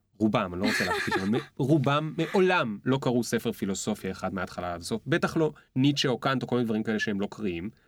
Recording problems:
none

